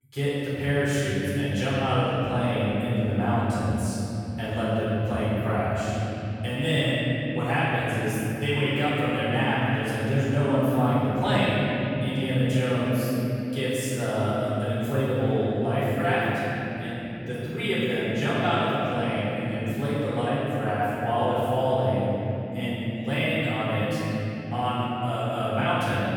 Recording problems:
room echo; strong; dies away in 3 s
off-mic speech; far

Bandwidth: 18 kHz